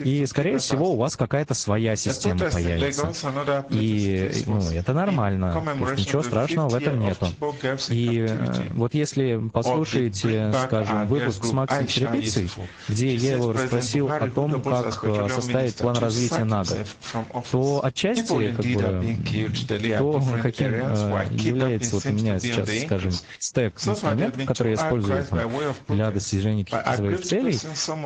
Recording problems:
garbled, watery; slightly
squashed, flat; somewhat
voice in the background; loud; throughout; 4 dB below the speech

